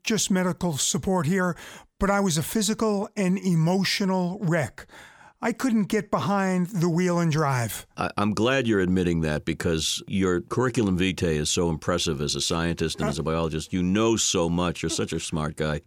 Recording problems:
none

